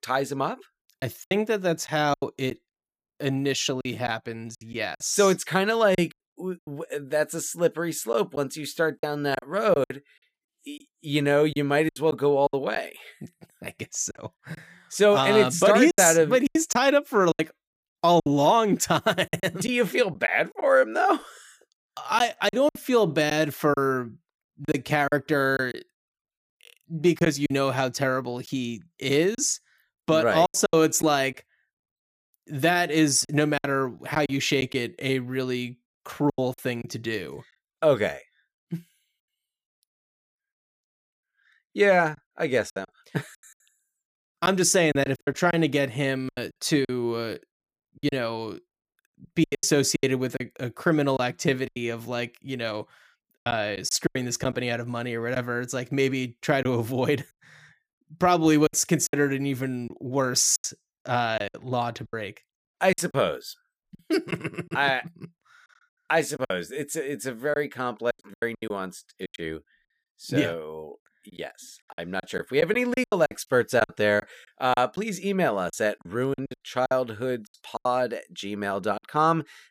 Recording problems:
choppy; very; 9% of the speech affected

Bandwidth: 15 kHz